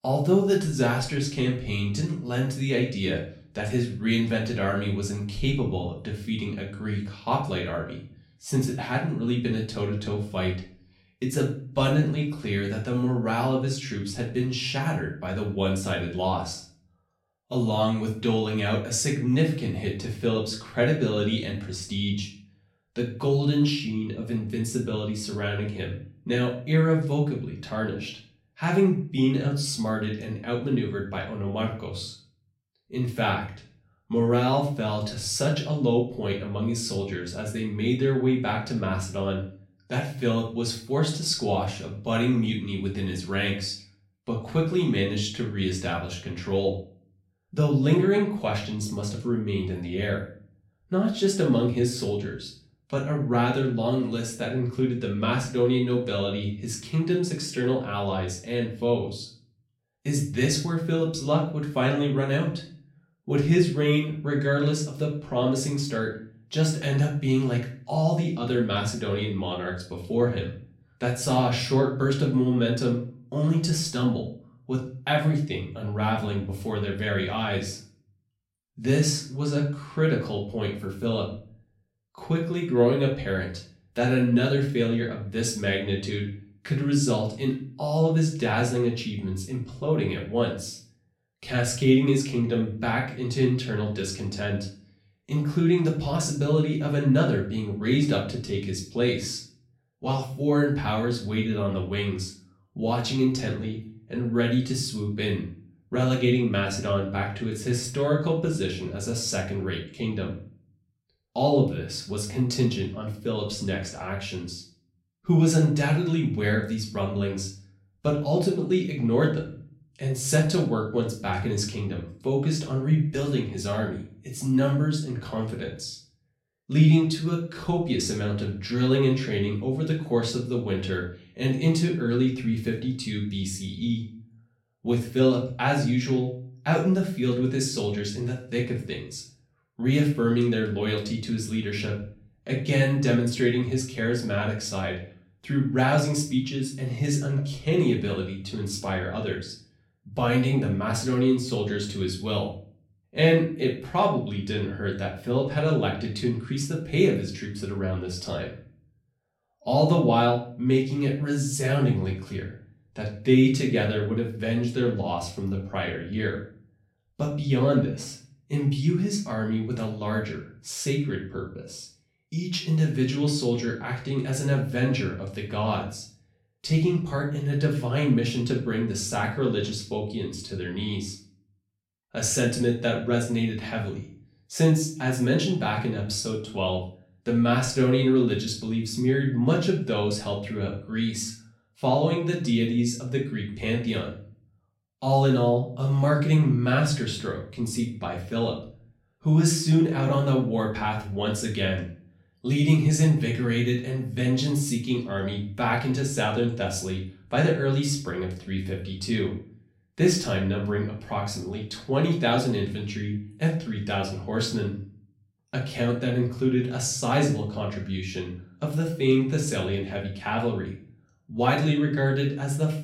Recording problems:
off-mic speech; far
room echo; slight; dies away in 0.4 s

